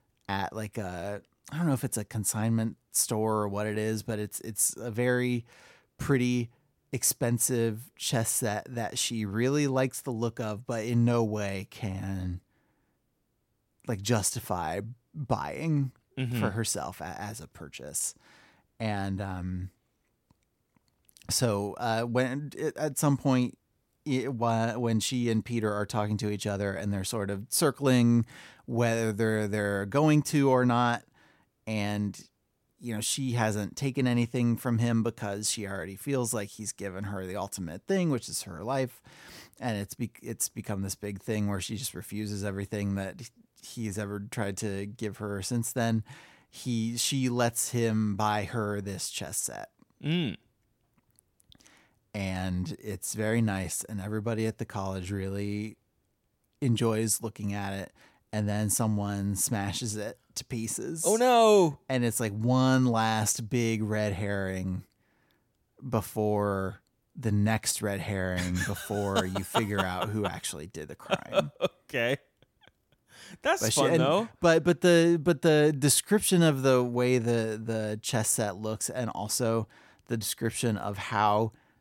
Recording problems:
none

